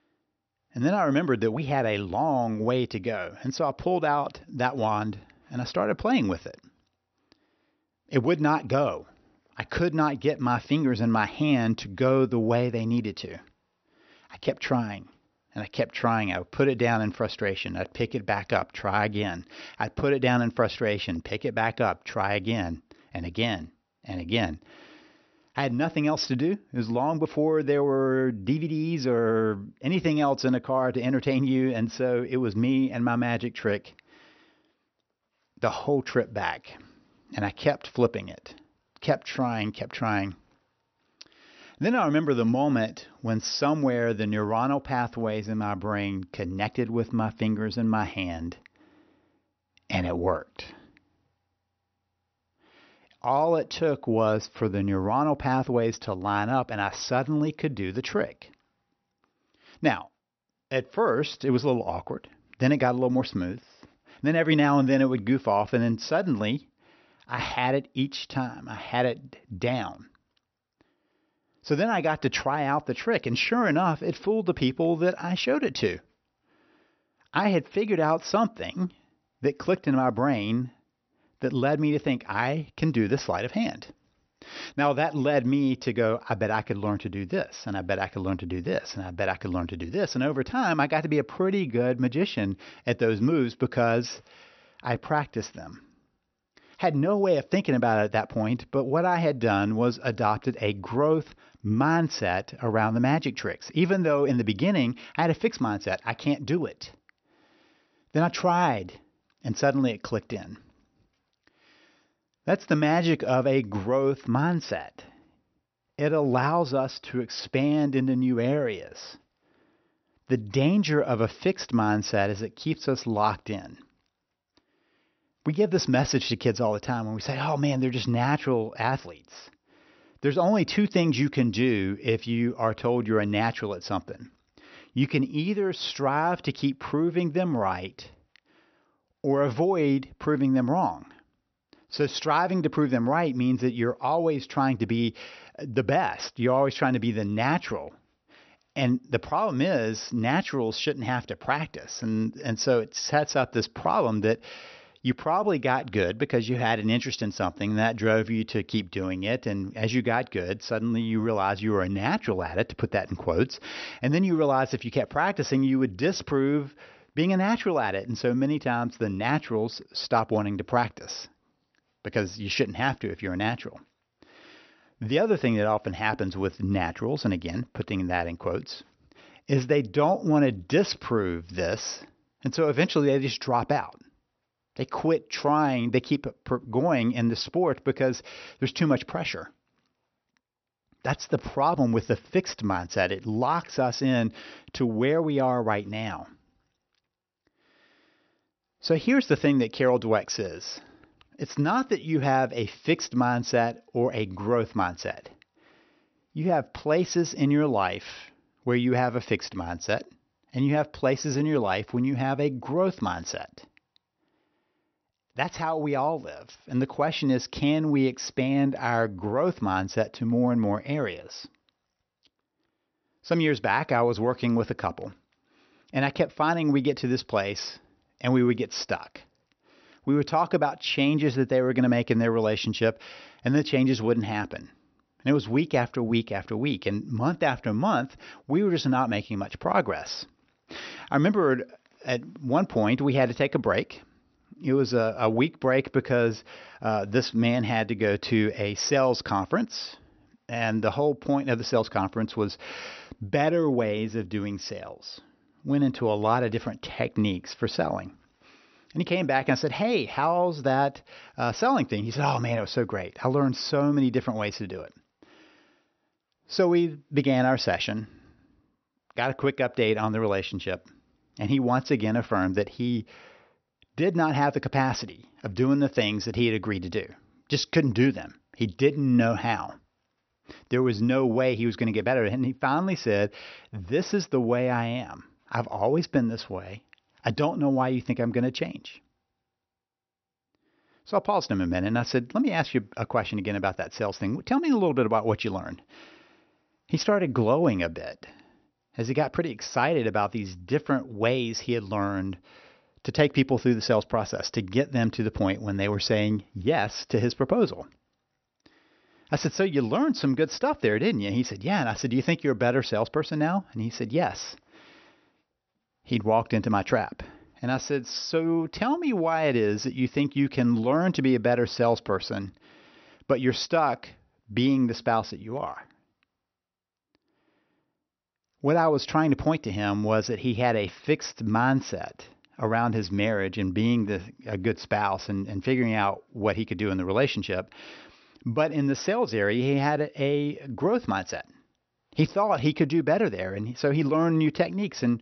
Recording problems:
high frequencies cut off; noticeable; nothing above 6 kHz

